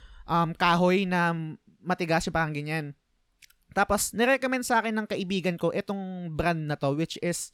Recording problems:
none

